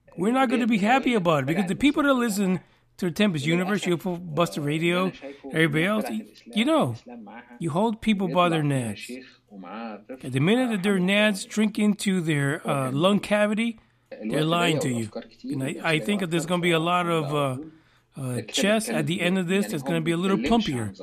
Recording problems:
voice in the background; noticeable; throughout; 10 dB below the speech

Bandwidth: 14.5 kHz